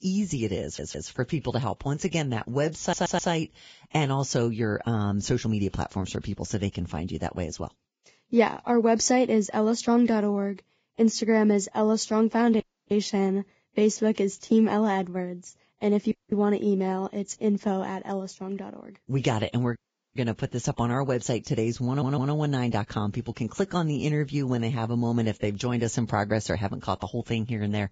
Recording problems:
garbled, watery; badly; nothing above 7.5 kHz
audio stuttering; at 0.5 s, at 3 s and at 22 s
audio cutting out; at 13 s, at 16 s and at 20 s

